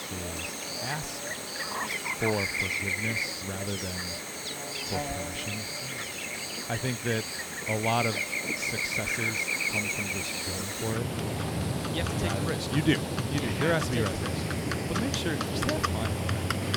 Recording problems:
animal sounds; very loud; throughout; 3 dB above the speech

